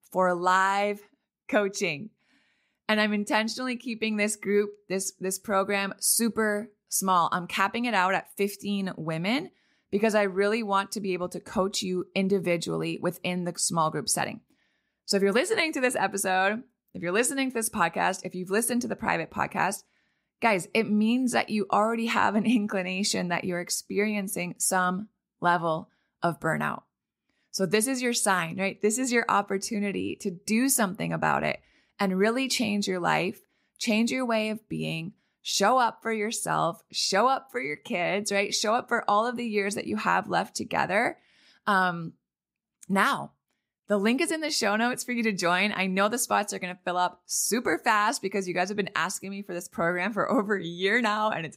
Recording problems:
none

